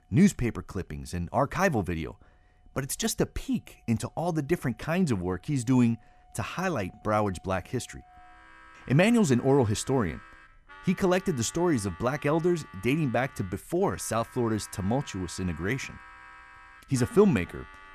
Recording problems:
background music; faint; throughout; 20 dB below the speech

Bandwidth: 14 kHz